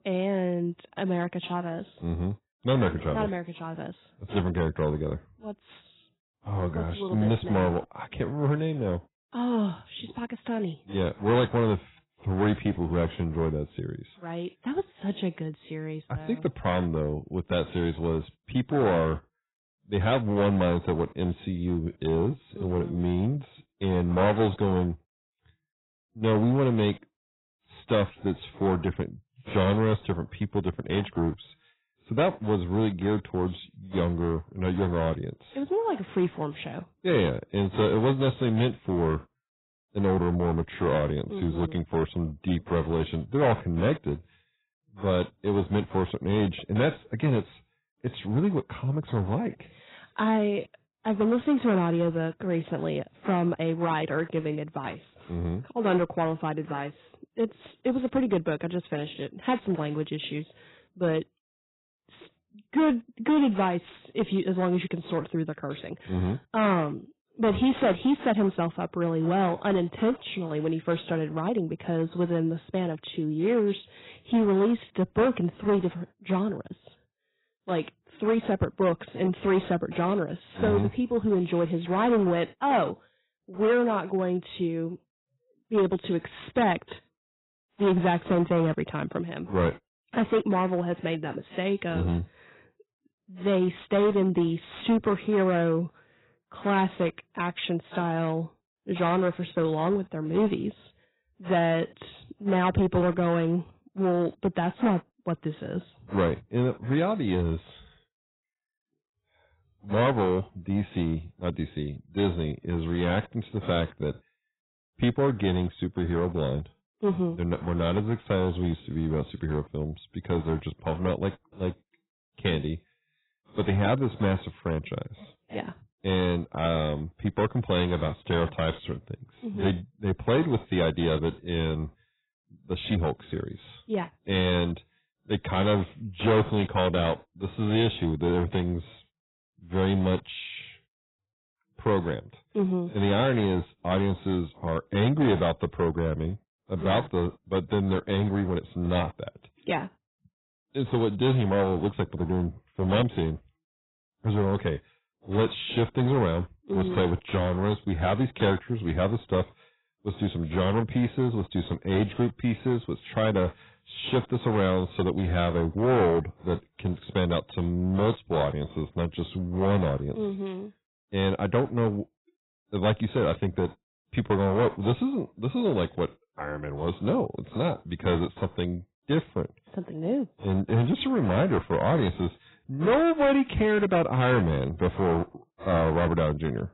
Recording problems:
garbled, watery; badly; nothing above 4 kHz
distortion; slight; 5% of the sound clipped

